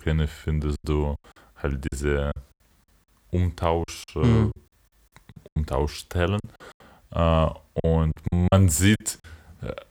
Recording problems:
choppy; very; 10% of the speech affected

